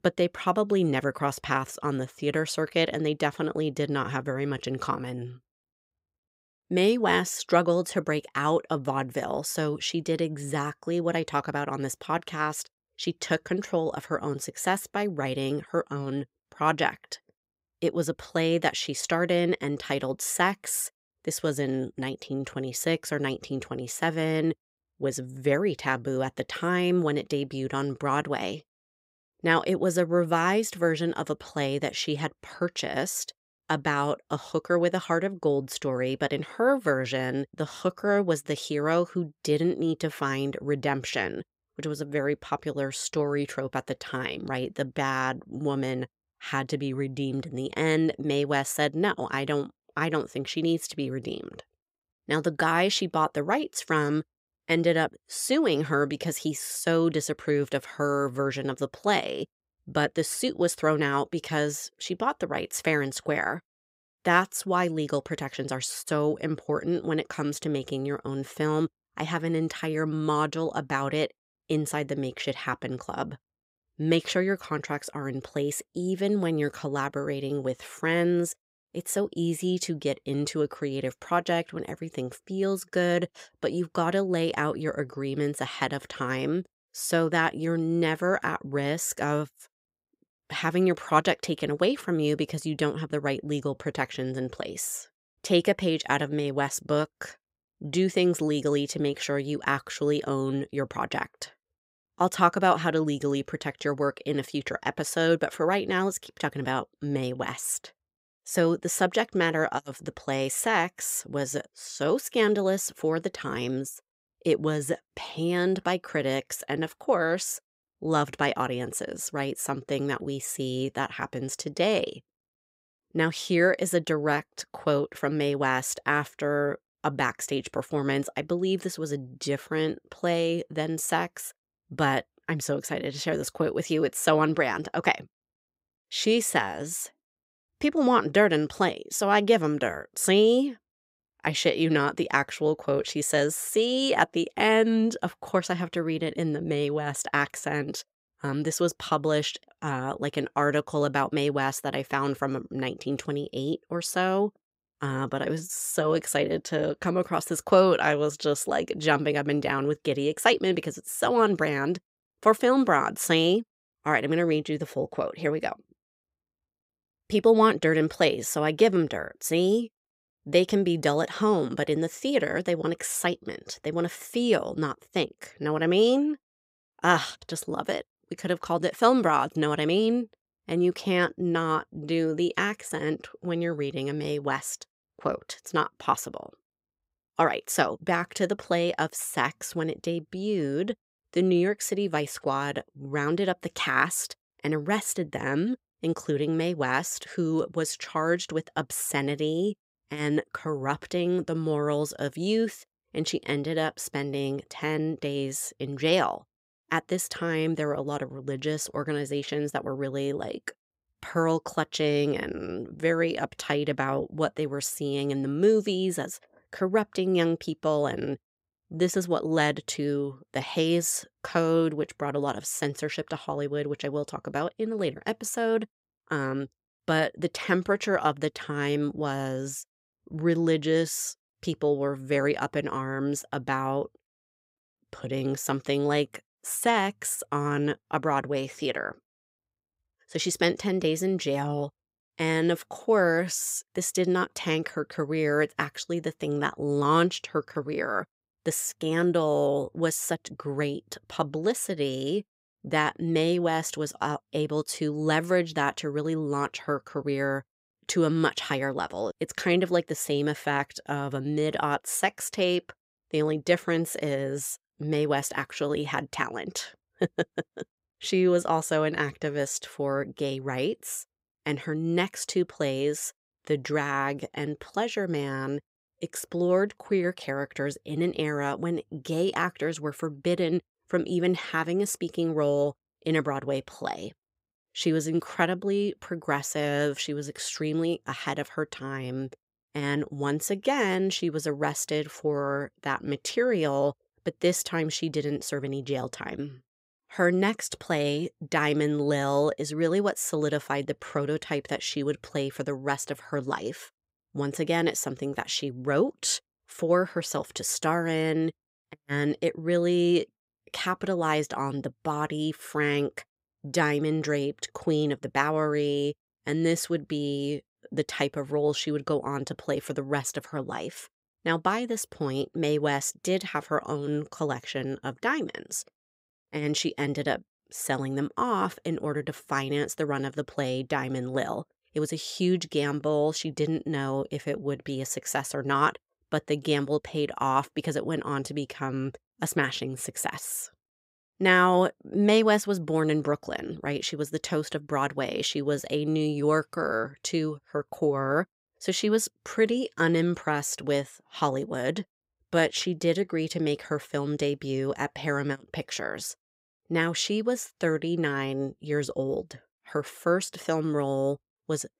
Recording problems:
none

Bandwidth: 15.5 kHz